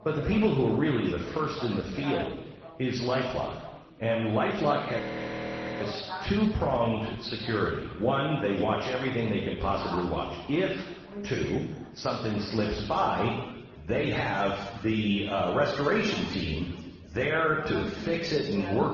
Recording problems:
off-mic speech; far
room echo; noticeable; dies away in 1.2 s
garbled, watery; slightly; nothing above 6 kHz
background chatter; noticeable; throughout; 4 voices, 15 dB below the speech
audio freezing; at 5 s for 1 s

